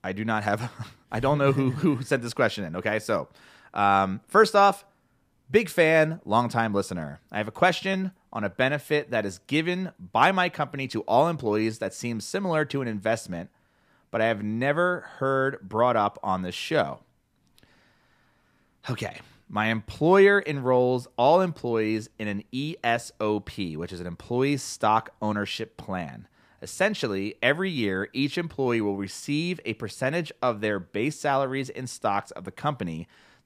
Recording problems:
none

